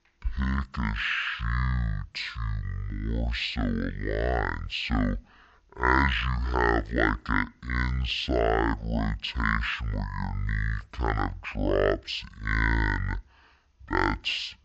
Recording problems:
wrong speed and pitch; too slow and too low; 0.5 times normal speed

